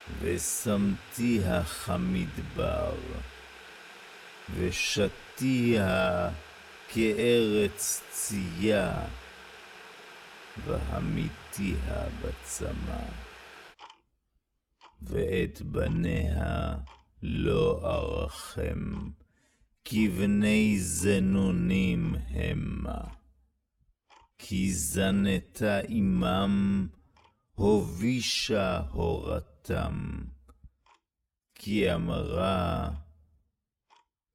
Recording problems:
wrong speed, natural pitch; too slow; 0.6 times normal speed
household noises; noticeable; throughout; 20 dB below the speech

